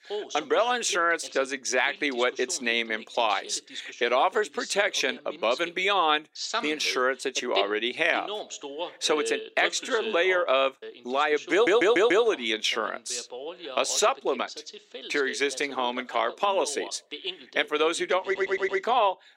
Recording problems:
thin; somewhat; fading below 300 Hz
voice in the background; noticeable; throughout; 15 dB below the speech
audio stuttering; at 12 s and at 18 s

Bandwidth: 16 kHz